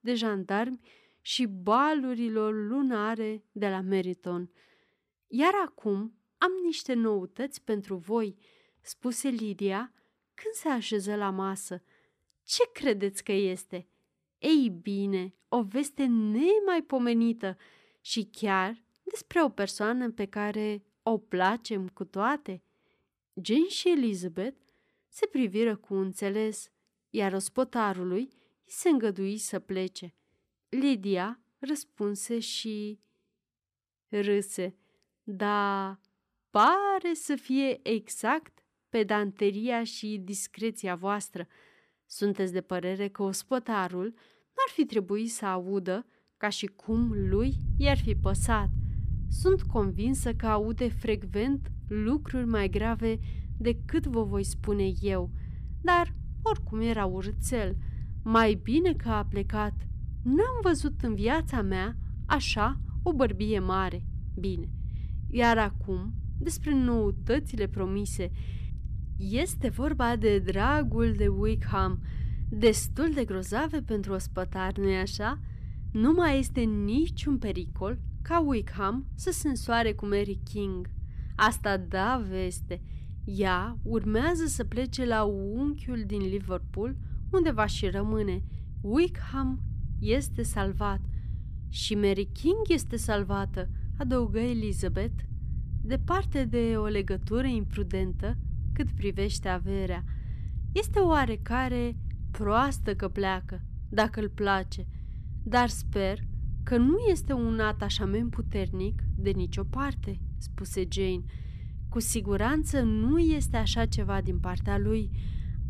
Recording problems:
low rumble; faint; from 47 s on; 20 dB below the speech

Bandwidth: 14.5 kHz